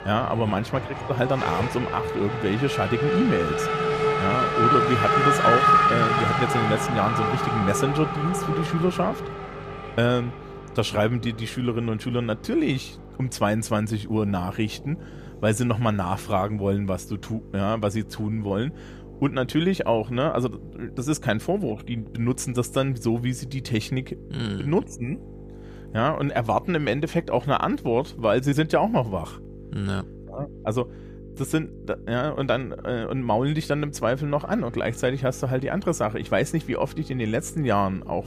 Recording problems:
traffic noise; very loud; throughout; 2 dB above the speech
electrical hum; faint; throughout; 50 Hz, 20 dB below the speech

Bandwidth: 14.5 kHz